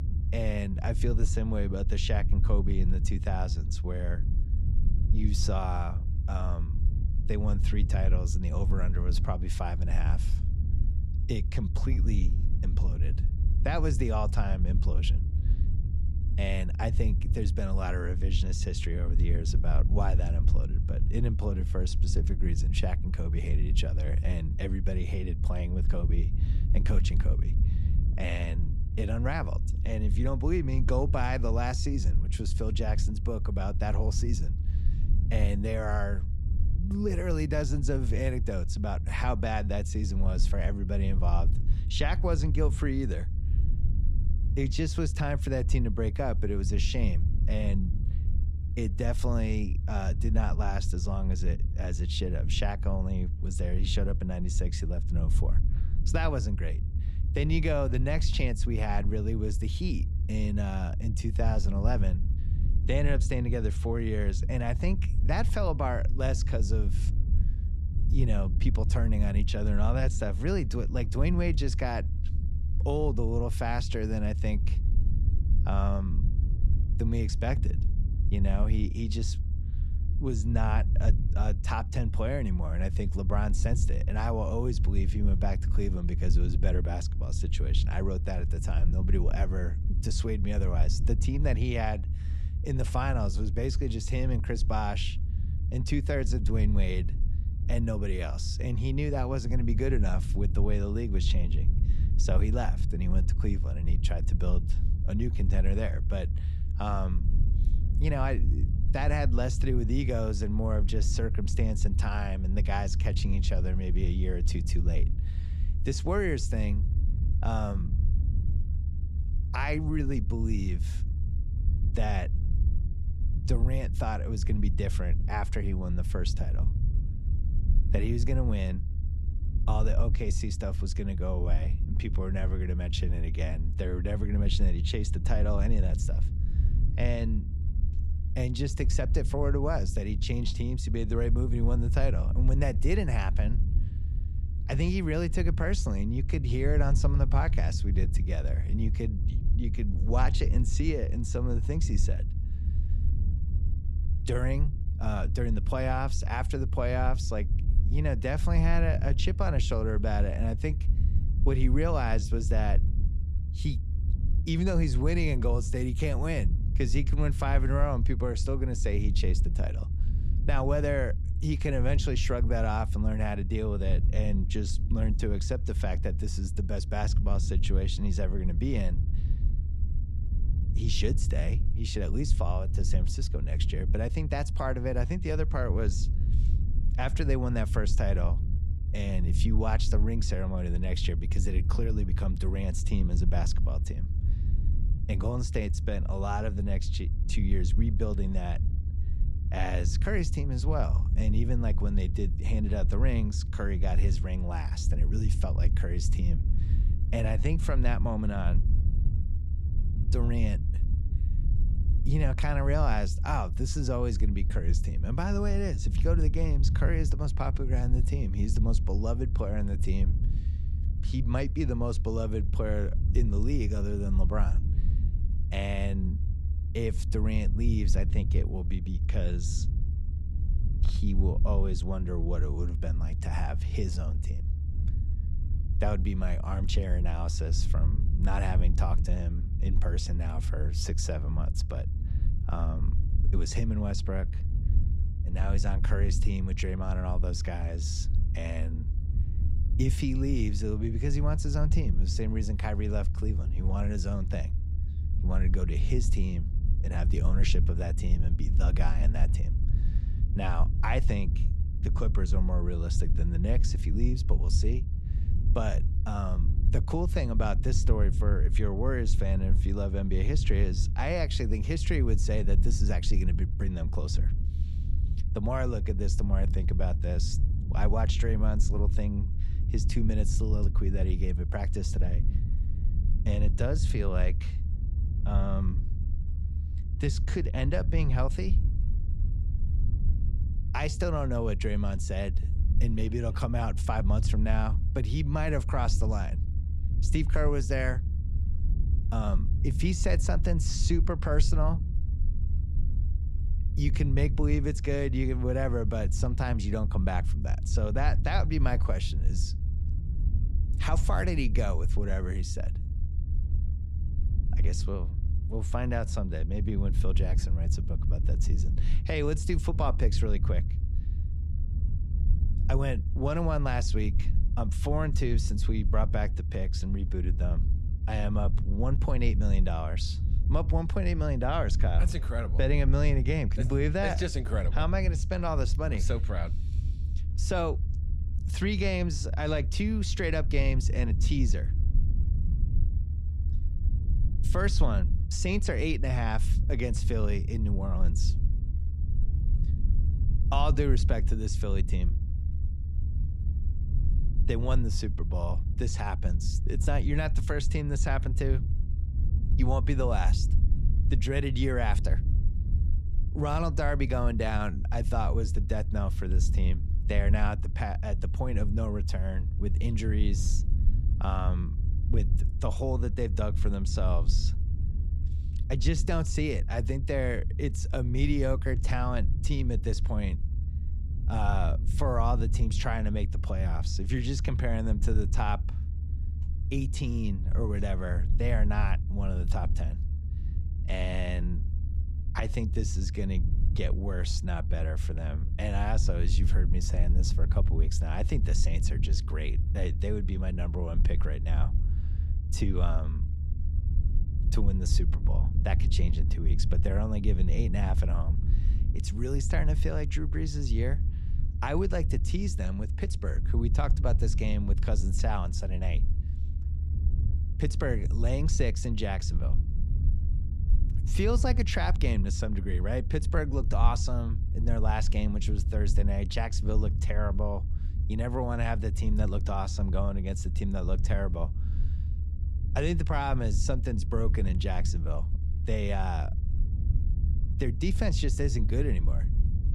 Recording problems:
low rumble; noticeable; throughout; 10 dB below the speech

